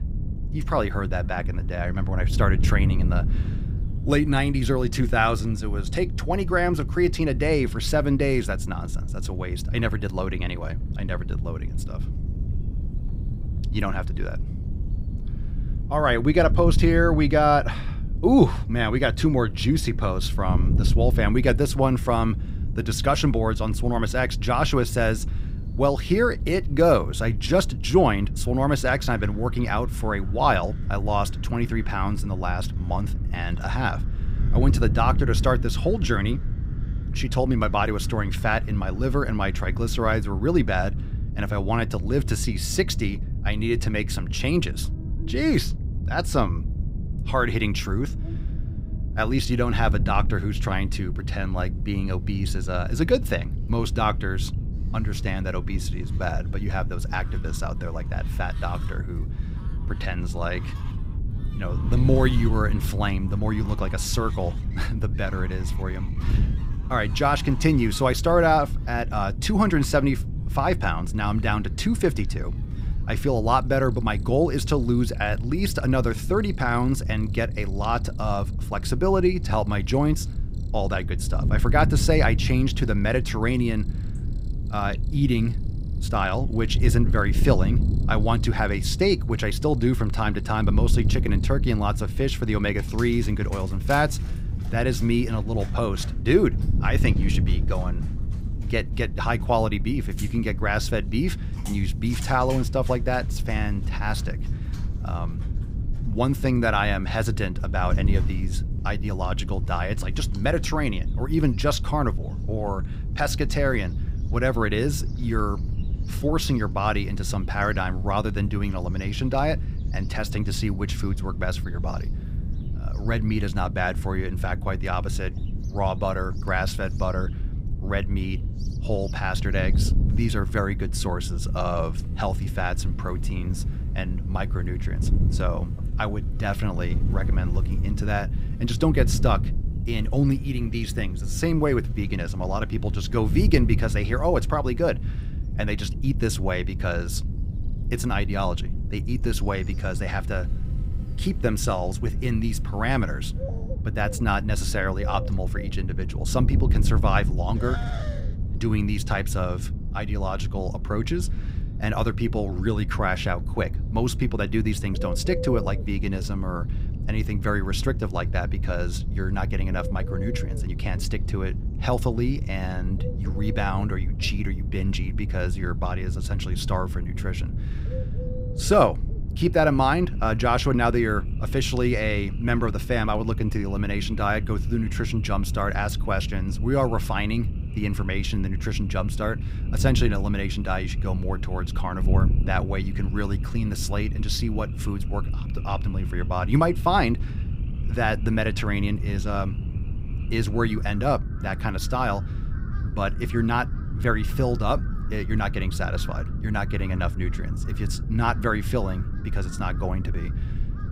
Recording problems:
wind noise on the microphone; occasional gusts; 15 dB below the speech
animal sounds; faint; throughout; 25 dB below the speech

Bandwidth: 15.5 kHz